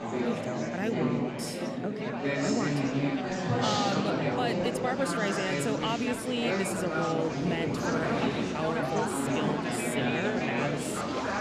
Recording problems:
murmuring crowd; very loud; throughout; 4 dB above the speech

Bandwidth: 13.5 kHz